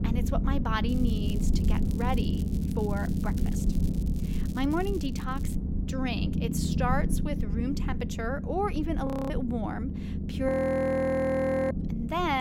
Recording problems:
low rumble; loud; throughout; 8 dB below the speech
crackling; faint; from 1 to 5.5 s; 20 dB below the speech
audio freezing; at 9 s and at 10 s for 1 s
abrupt cut into speech; at the end

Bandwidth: 16 kHz